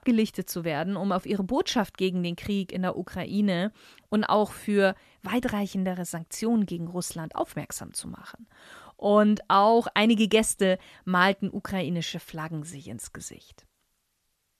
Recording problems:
none

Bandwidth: 13.5 kHz